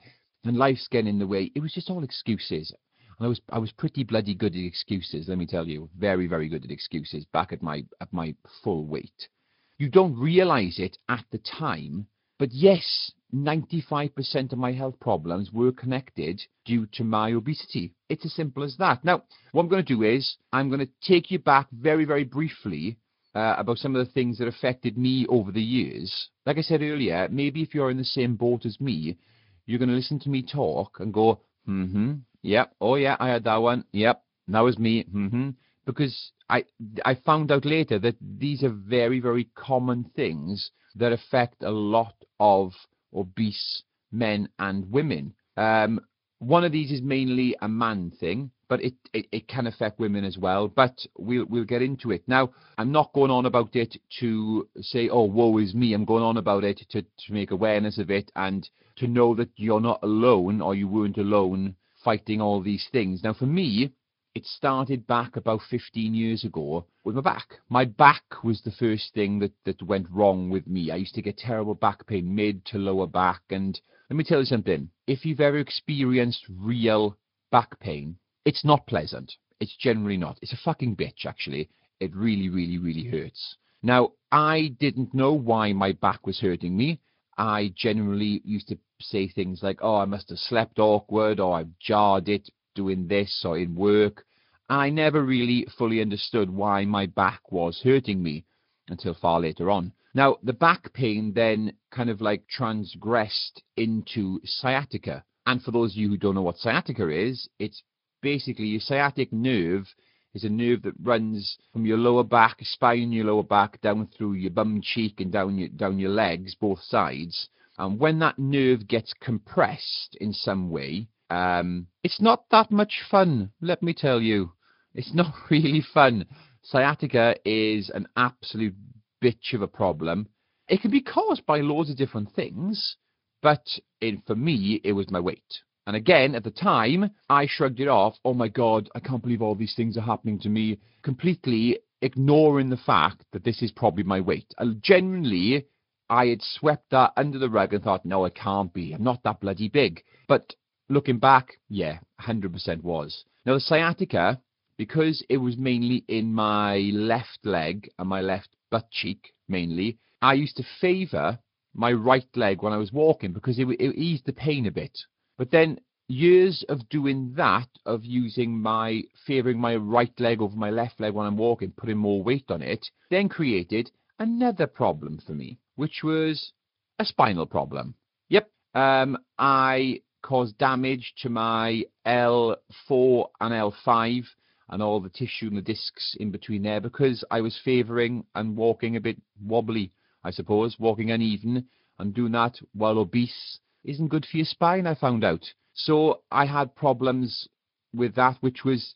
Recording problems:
high frequencies cut off; noticeable; nothing above 5 kHz
garbled, watery; slightly

